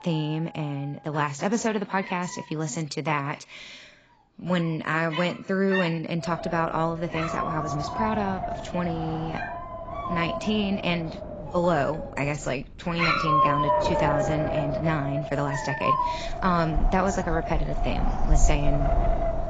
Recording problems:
garbled, watery; badly; nothing above 7.5 kHz
wind noise on the microphone; heavy; from 6 s on; 3 dB below the speech
animal sounds; loud; throughout; 2 dB below the speech

